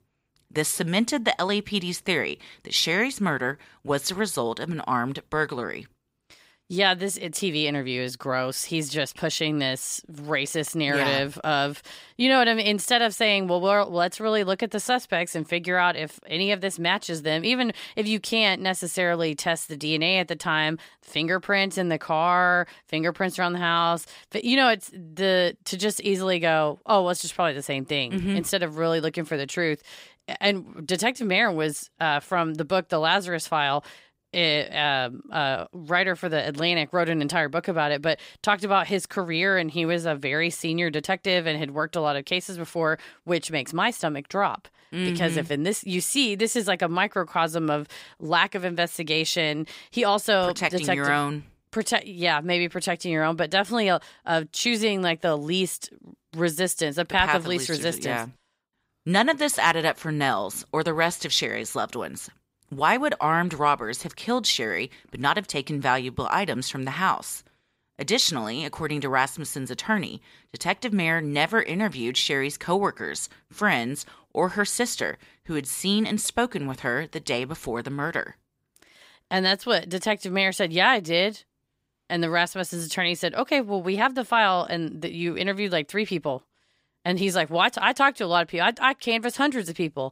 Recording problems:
none

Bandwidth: 15.5 kHz